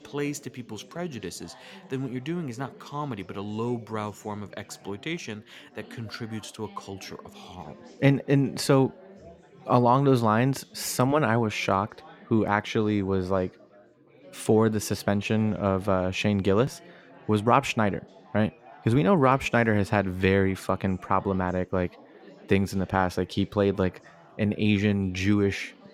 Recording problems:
chatter from many people; faint; throughout; 25 dB below the speech

